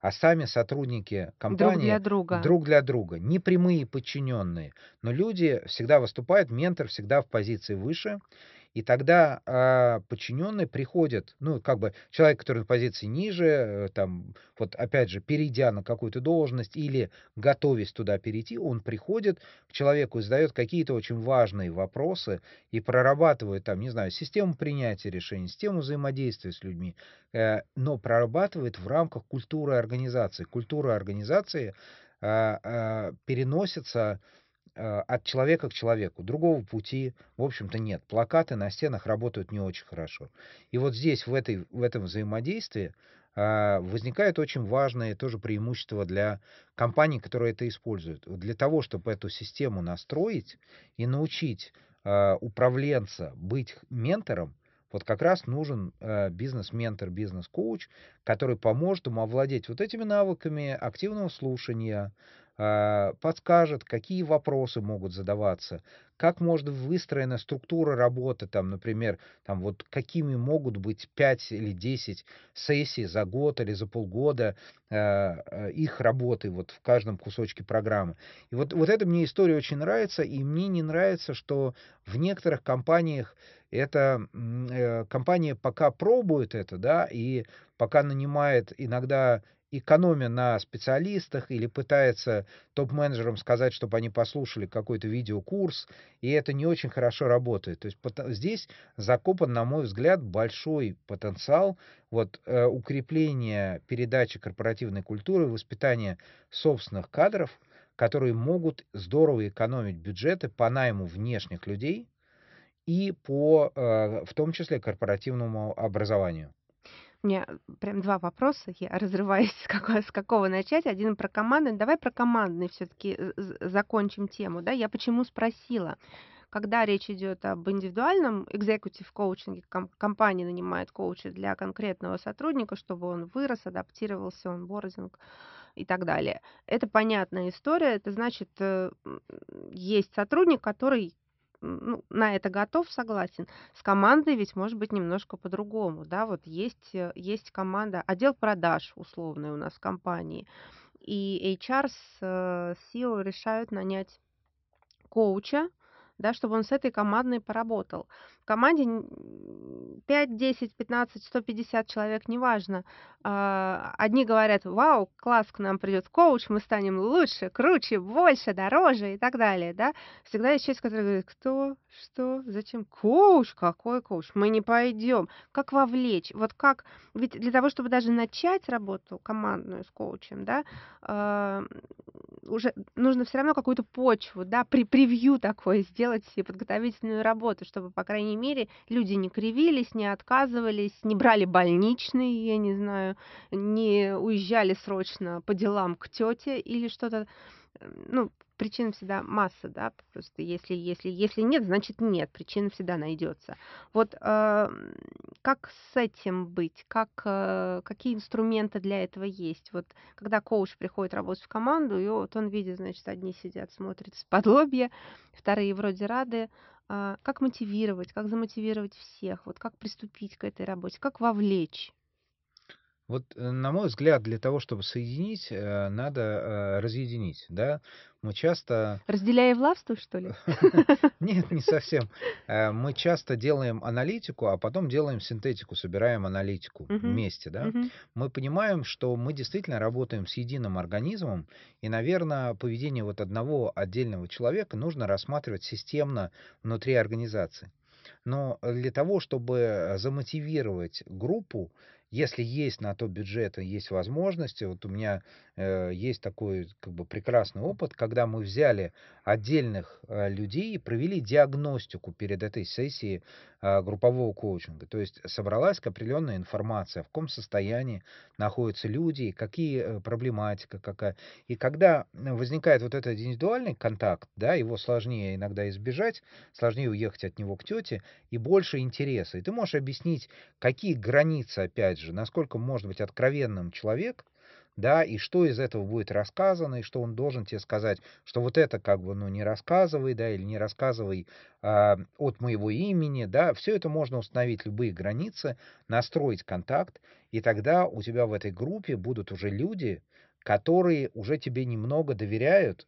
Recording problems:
high frequencies cut off; noticeable; nothing above 5.5 kHz

